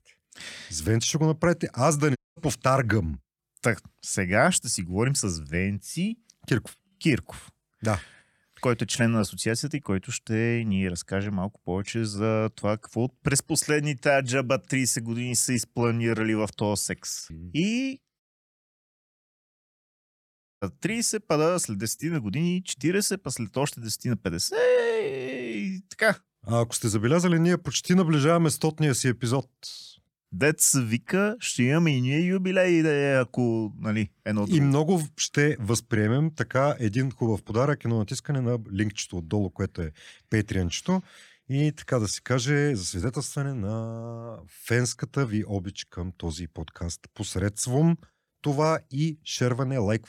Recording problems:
audio cutting out; at 2 s and at 18 s for 2.5 s

